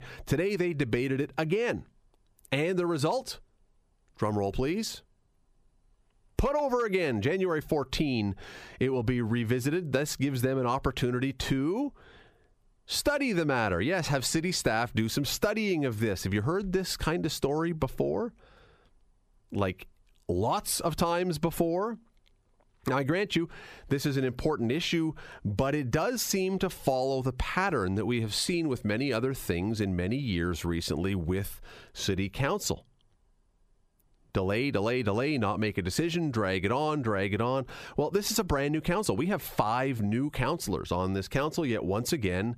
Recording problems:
squashed, flat; heavily

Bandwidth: 14.5 kHz